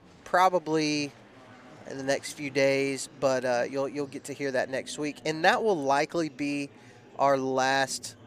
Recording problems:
murmuring crowd; faint; throughout; 25 dB below the speech

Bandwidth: 15 kHz